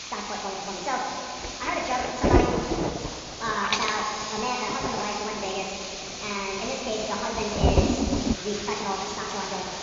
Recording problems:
wrong speed and pitch; too fast and too high; 1.6 times normal speed
room echo; noticeable; dies away in 2.1 s
high frequencies cut off; noticeable; nothing above 7 kHz
off-mic speech; somewhat distant
rain or running water; very loud; throughout; 2 dB above the speech
hiss; loud; throughout; 3 dB below the speech

